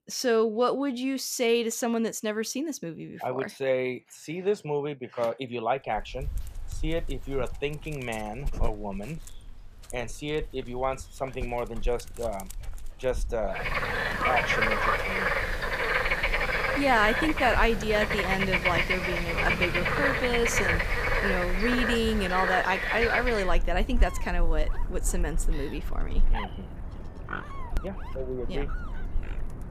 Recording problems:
animal sounds; very loud; from 6 s on; 1 dB above the speech

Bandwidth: 14.5 kHz